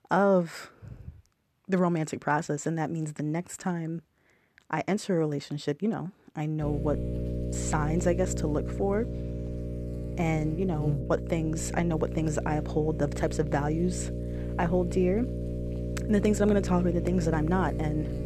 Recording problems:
electrical hum; loud; from 6.5 s on; 60 Hz, 9 dB below the speech

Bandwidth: 13.5 kHz